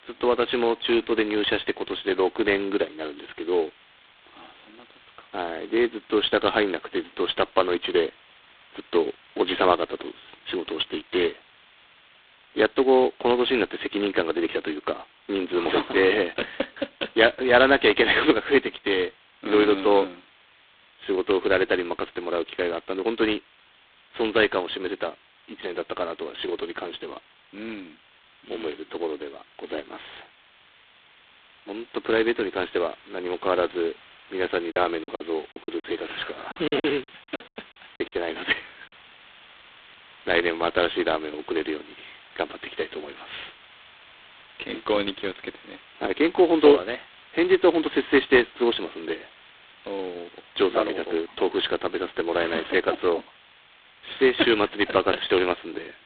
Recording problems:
phone-call audio; poor line; nothing above 4 kHz
hiss; faint; throughout; 25 dB below the speech
choppy; very; from 35 to 38 s; 15% of the speech affected

